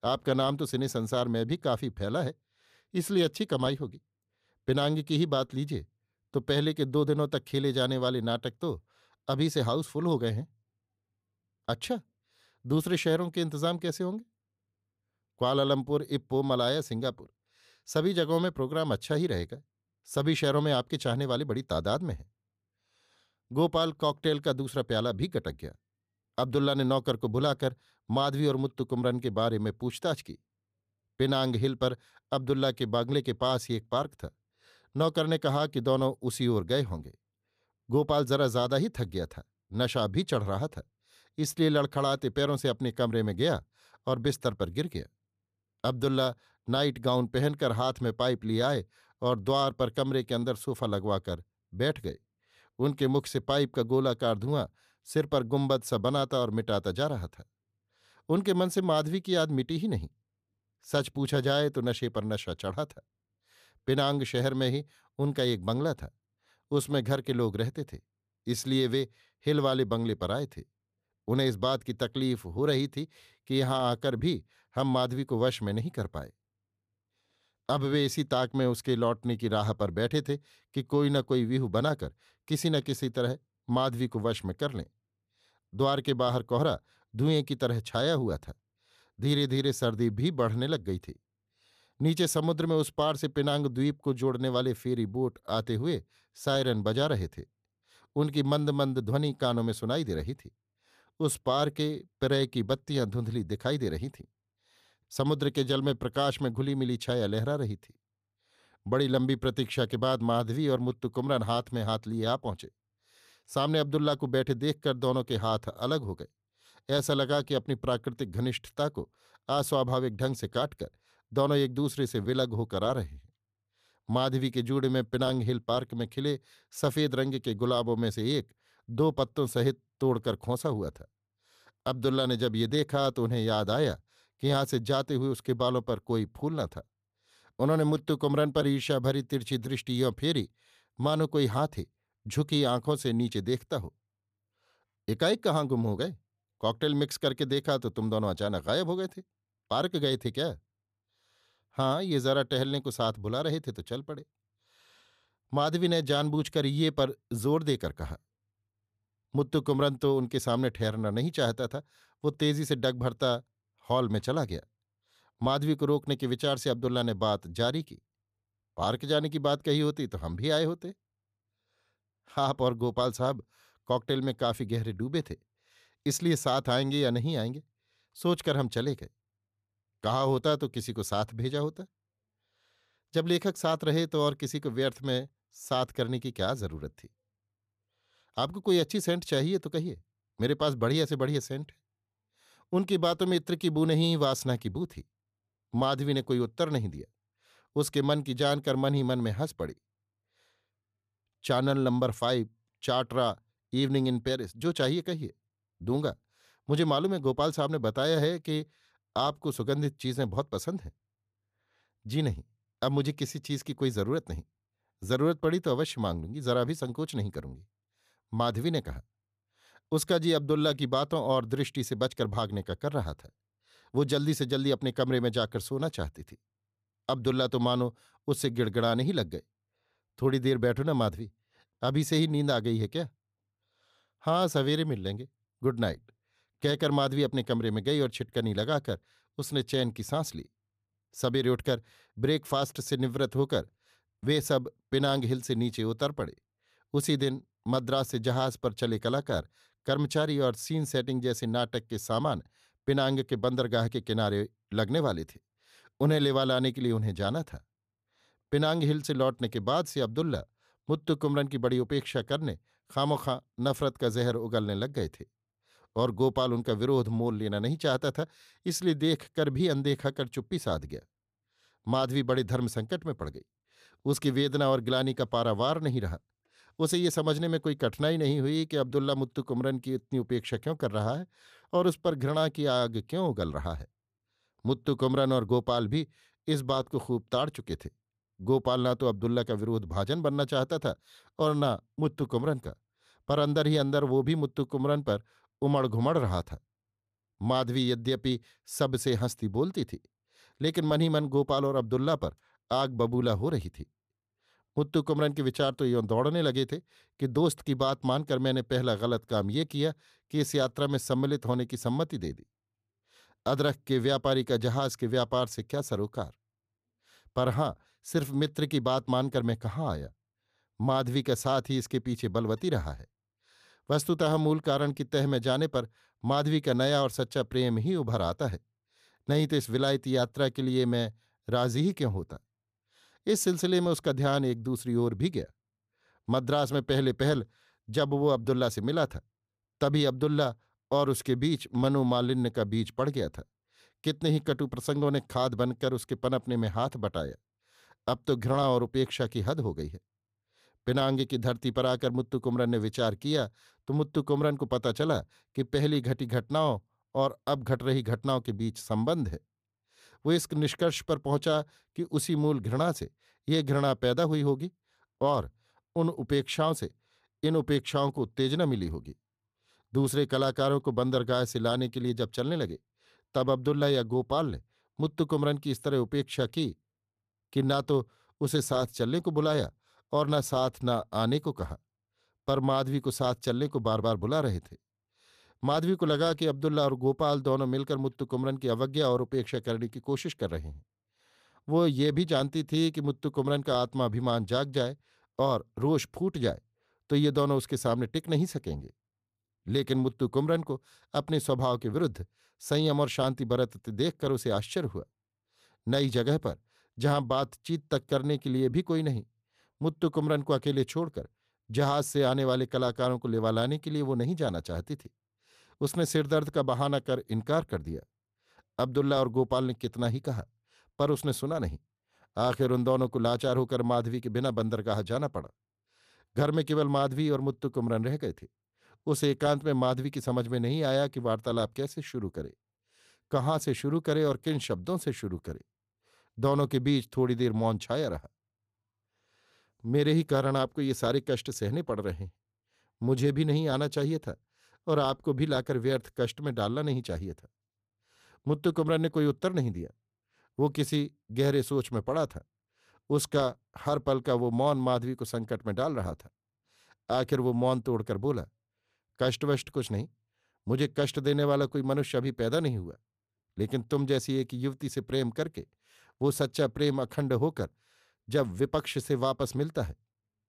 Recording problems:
none

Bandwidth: 14.5 kHz